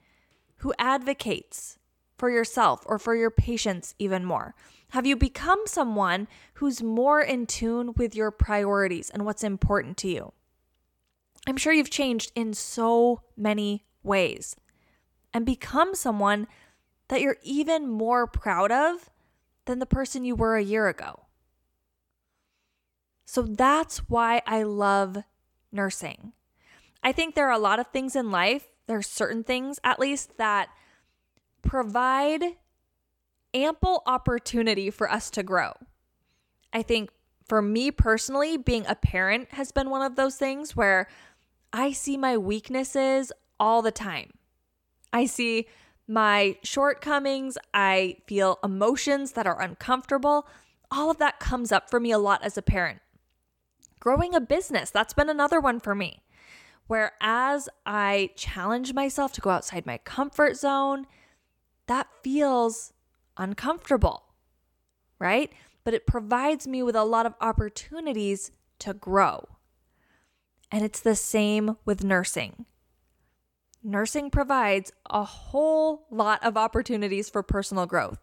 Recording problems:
none

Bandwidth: 17.5 kHz